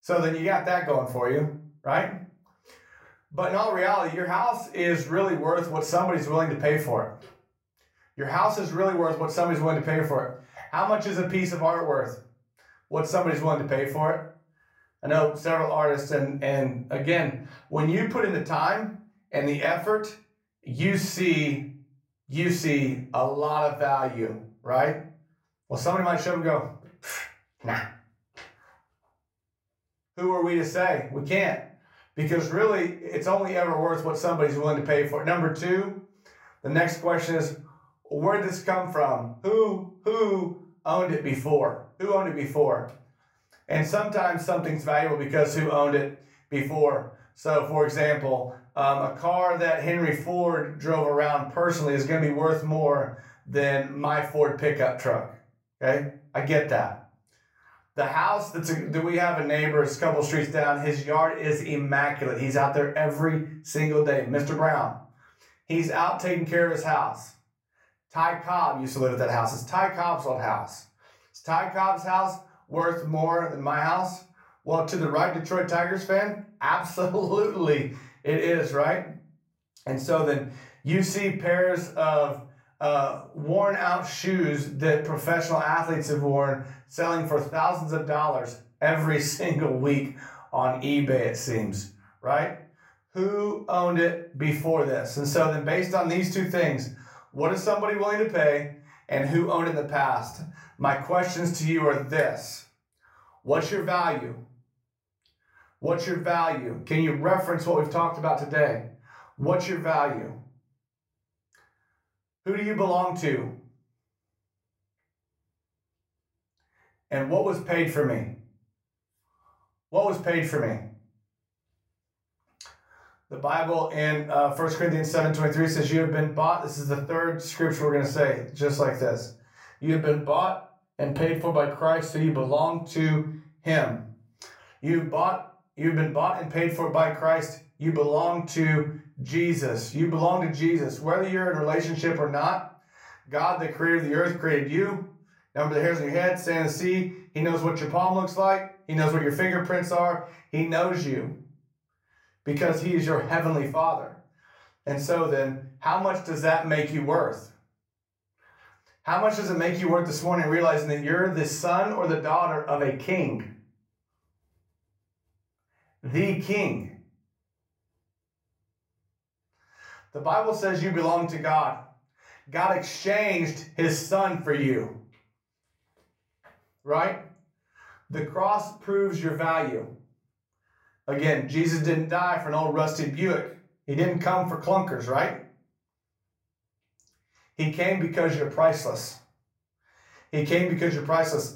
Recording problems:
room echo; slight; dies away in 0.3 s
off-mic speech; somewhat distant

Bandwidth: 16 kHz